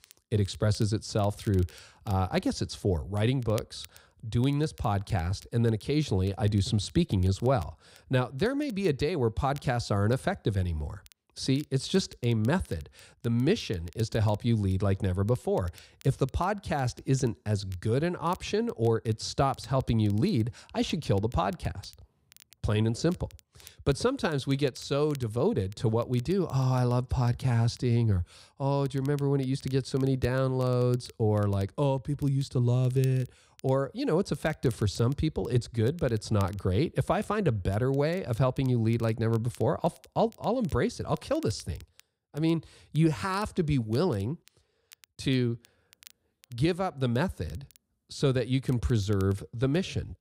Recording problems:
crackle, like an old record; faint; 25 dB below the speech

